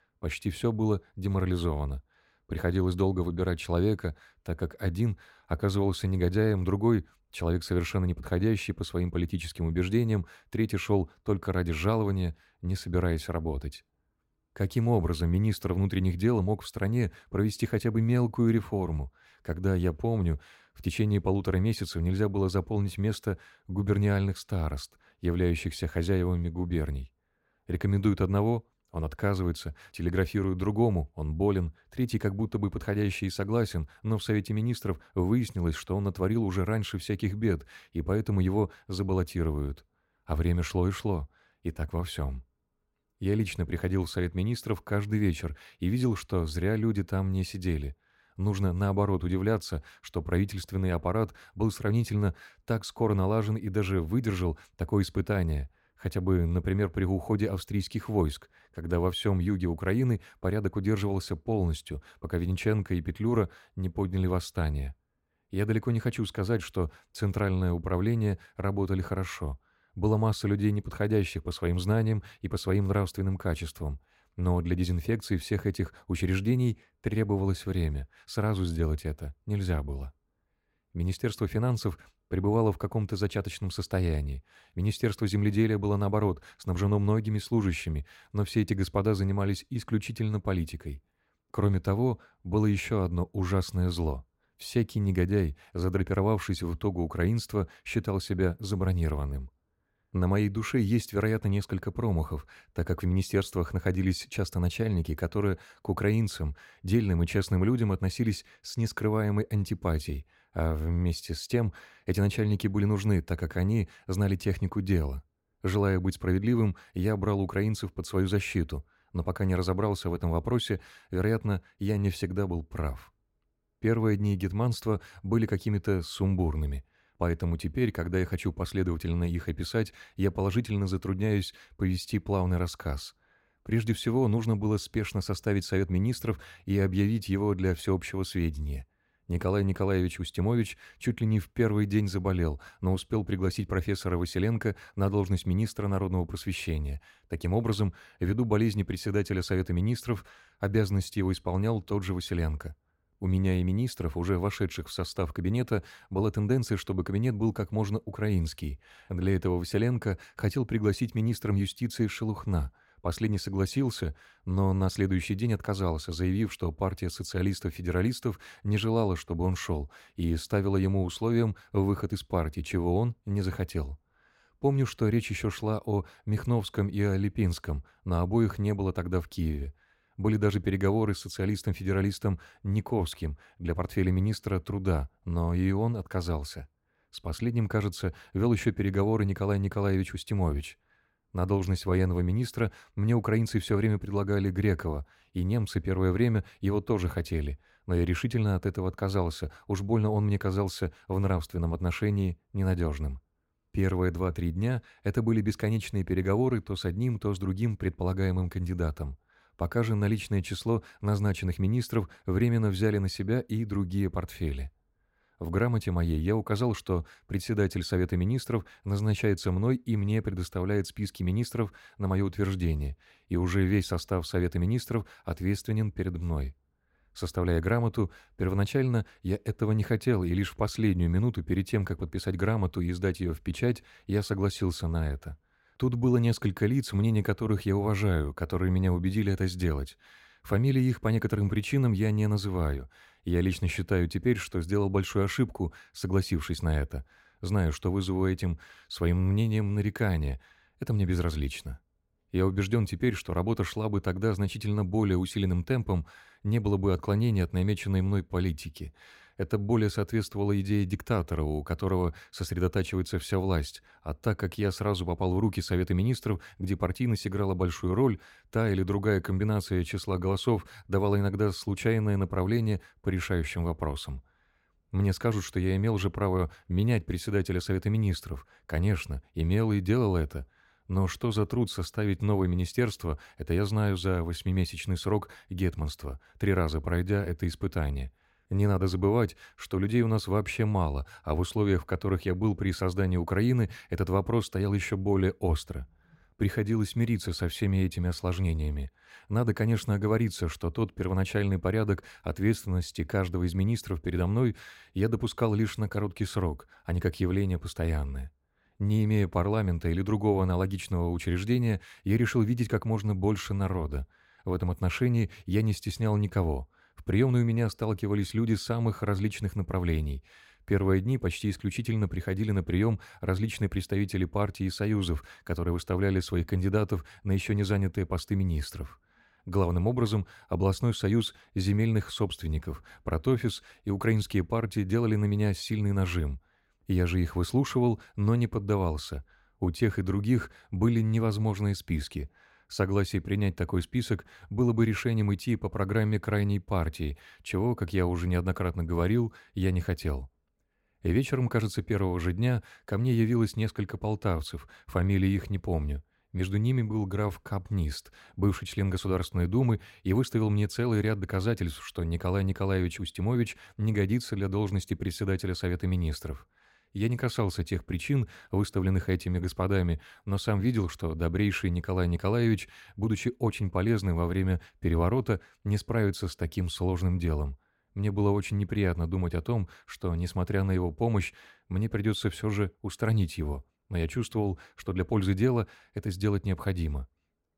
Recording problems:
none

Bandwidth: 16 kHz